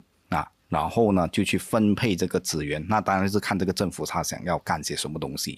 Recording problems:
none

